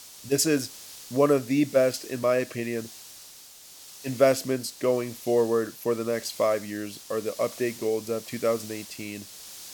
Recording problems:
hiss; noticeable; throughout; 15 dB below the speech

